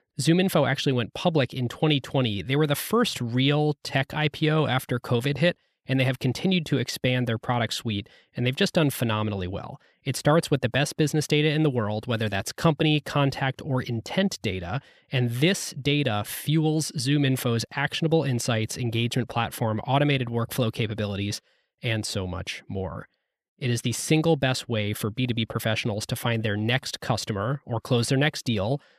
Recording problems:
none

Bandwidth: 14.5 kHz